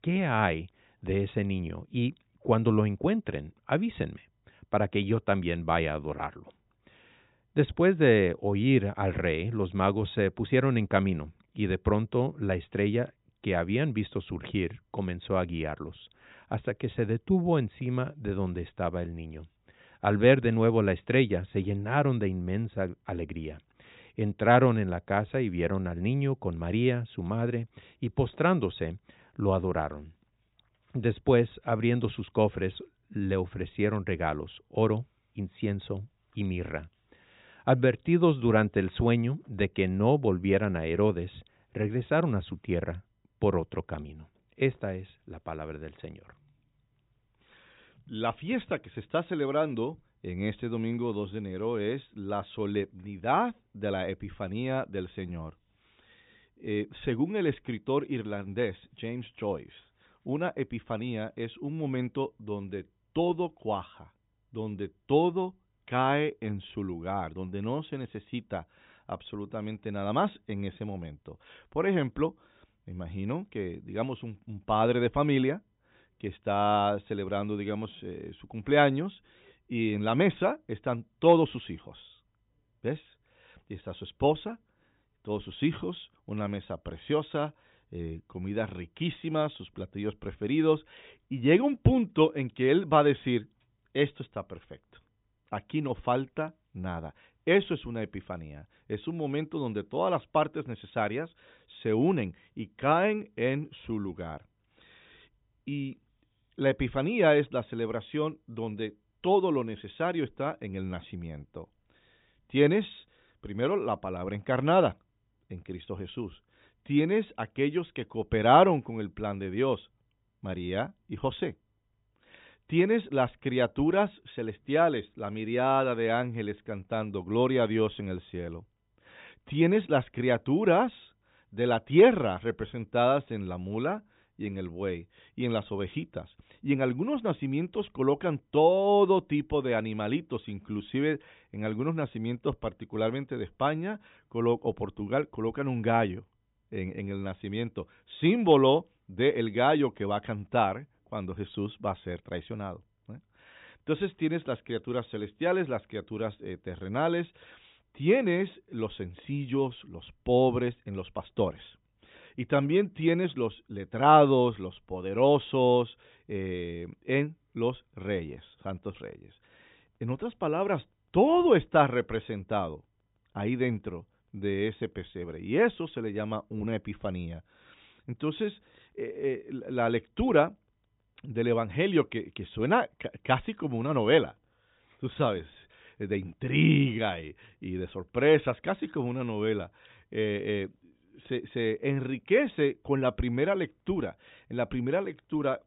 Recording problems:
high frequencies cut off; severe; nothing above 4 kHz

